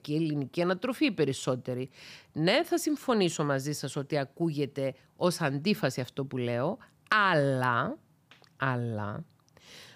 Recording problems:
none

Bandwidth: 15 kHz